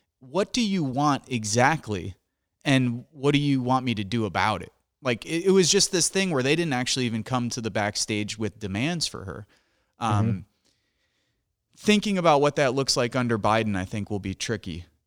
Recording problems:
none

